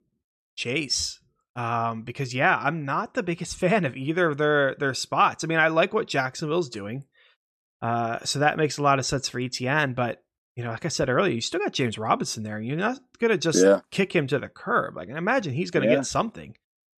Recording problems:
none

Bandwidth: 13.5 kHz